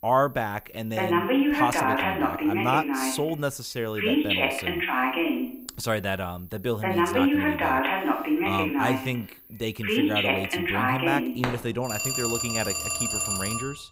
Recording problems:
alarms or sirens; very loud; throughout; 5 dB above the speech

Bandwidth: 15.5 kHz